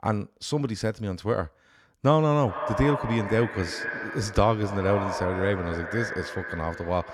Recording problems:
echo of what is said; strong; from 2.5 s on; 210 ms later, 6 dB below the speech

